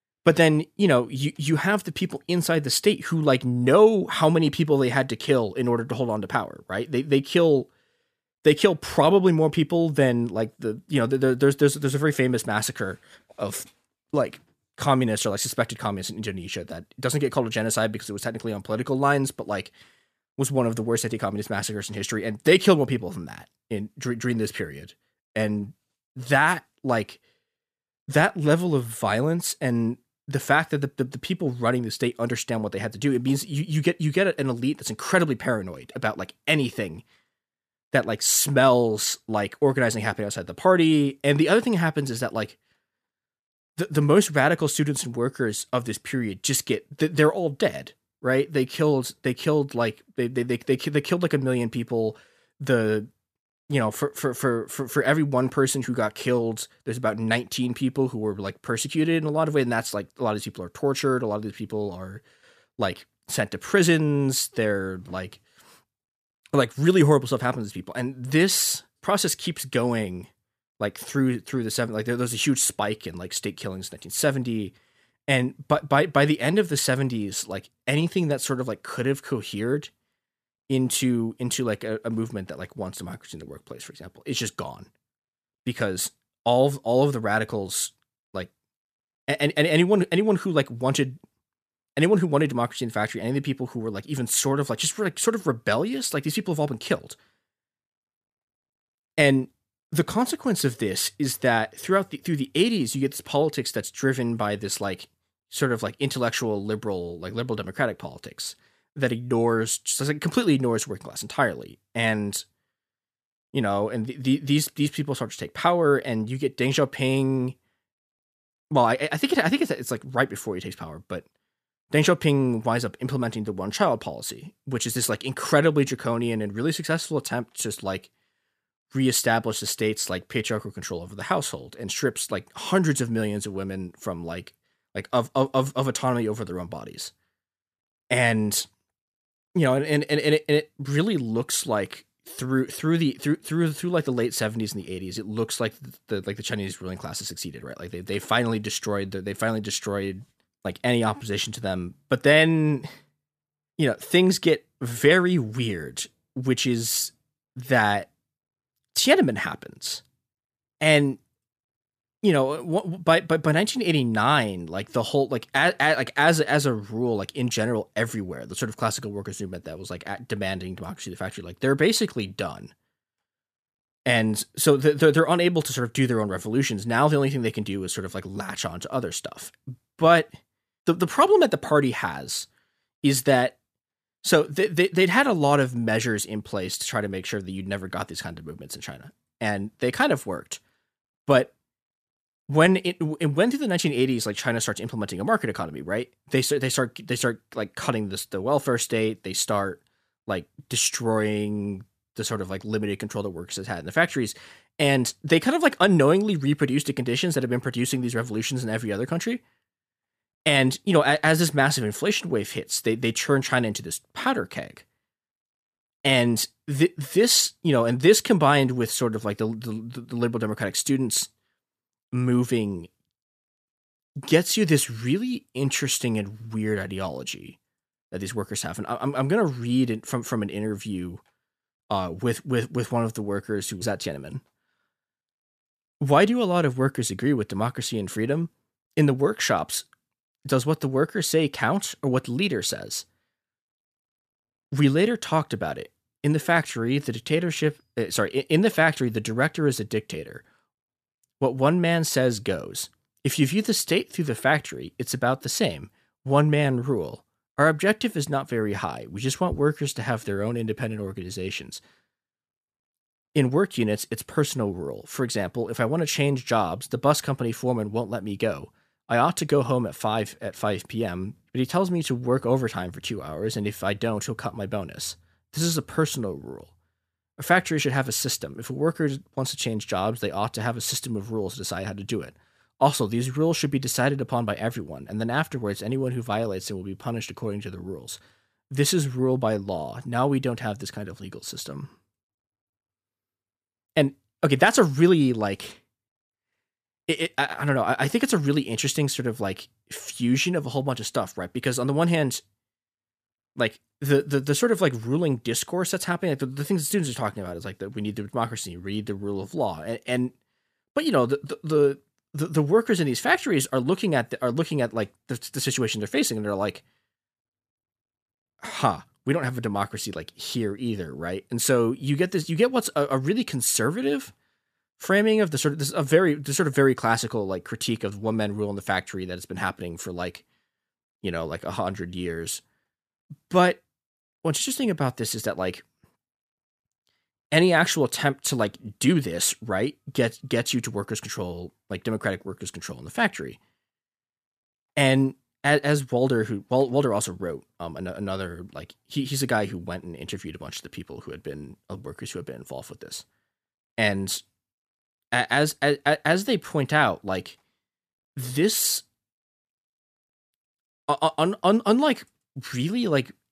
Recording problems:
none

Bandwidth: 14.5 kHz